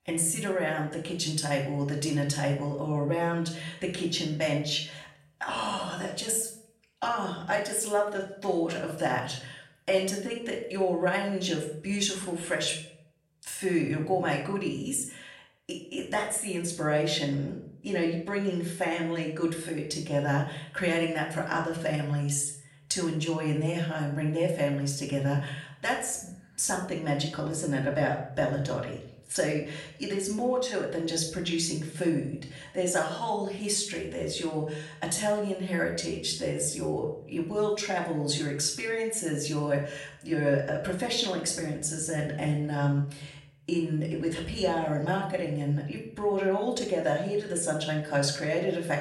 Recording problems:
off-mic speech; far
room echo; slight; dies away in 0.5 s

